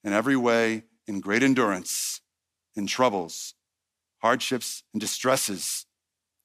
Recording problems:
none

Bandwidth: 15 kHz